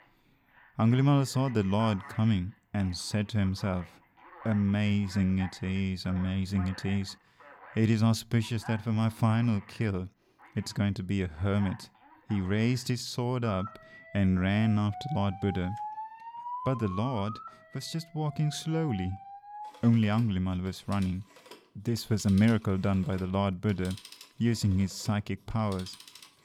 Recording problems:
alarms or sirens; noticeable; throughout; 15 dB below the speech

